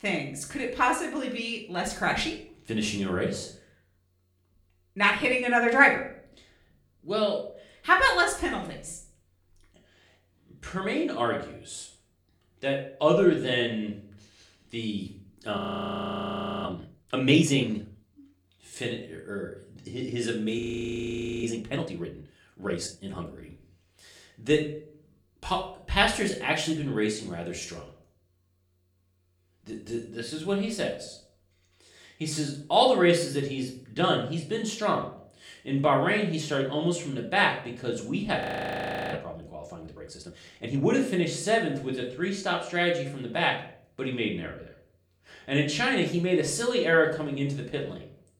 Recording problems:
room echo; slight; dies away in 0.5 s
off-mic speech; somewhat distant
audio freezing; at 16 s for 1 s, at 21 s for 1 s and at 38 s for 0.5 s

